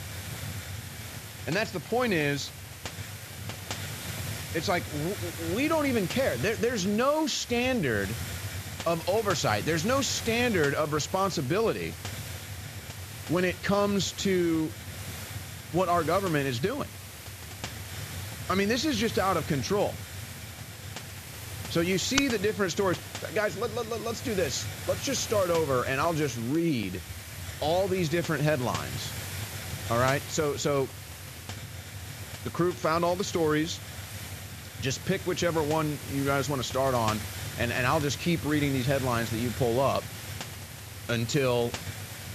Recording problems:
high frequencies cut off; noticeable; nothing above 7.5 kHz
hiss; loud; throughout; 10 dB below the speech

